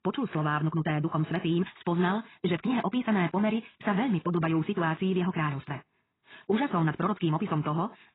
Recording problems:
garbled, watery; badly; nothing above 4 kHz
wrong speed, natural pitch; too fast; 1.8 times normal speed

